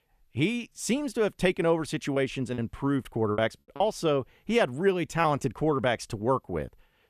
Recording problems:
choppy; very; from 2 to 4 s; 8% of the speech affected

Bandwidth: 14 kHz